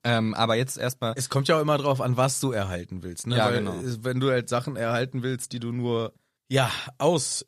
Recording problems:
none

